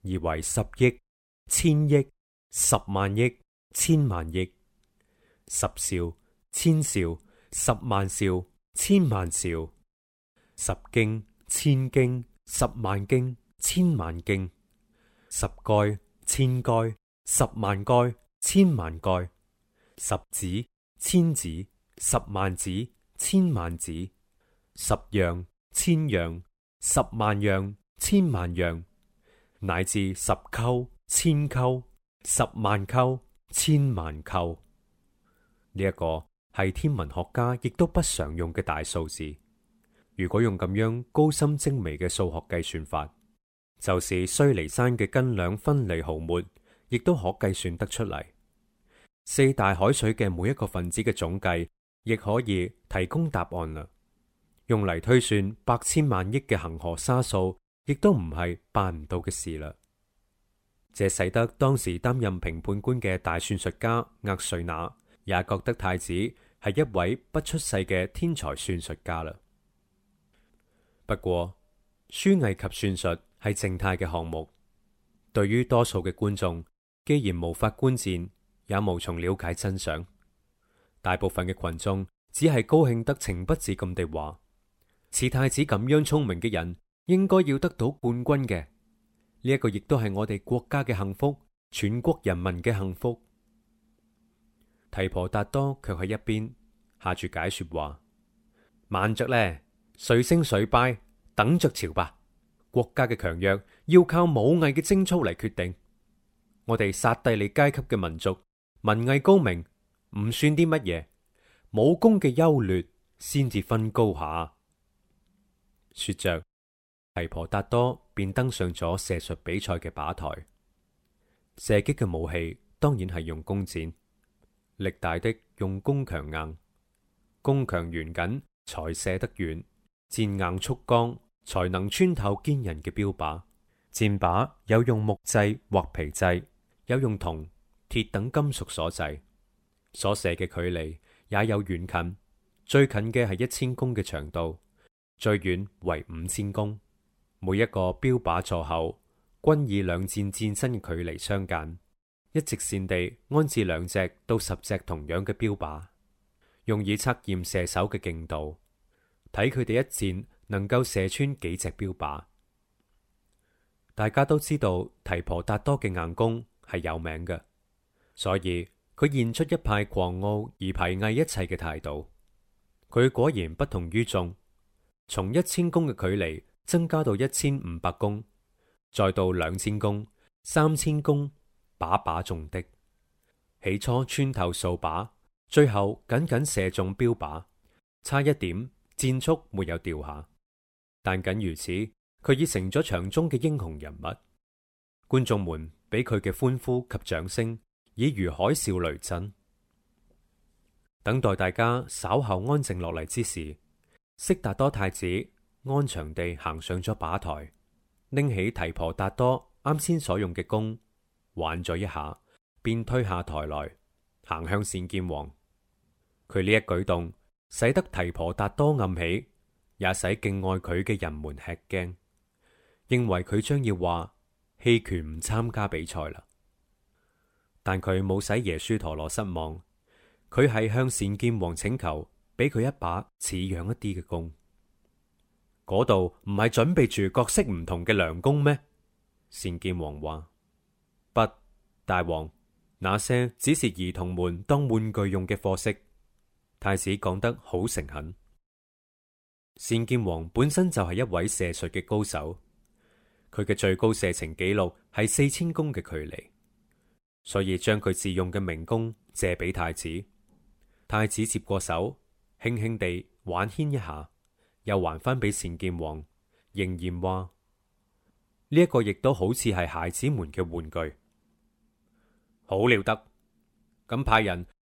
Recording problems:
none

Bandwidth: 16 kHz